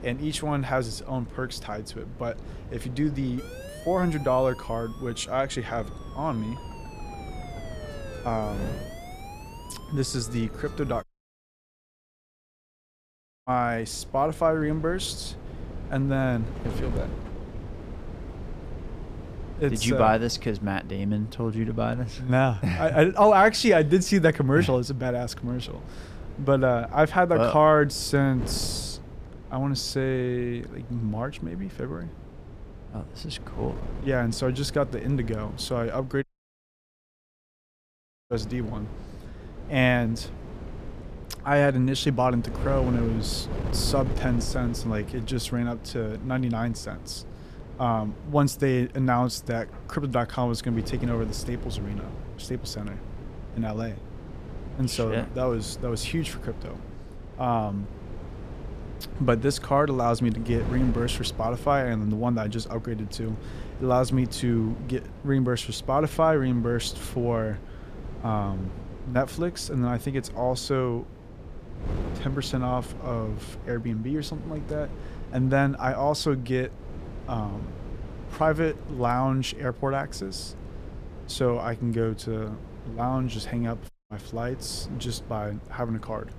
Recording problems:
wind noise on the microphone; occasional gusts; 20 dB below the speech
siren; faint; from 3.5 to 11 s; peak 15 dB below the speech
audio cutting out; at 11 s for 2.5 s, at 36 s for 2 s and at 1:24

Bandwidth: 14.5 kHz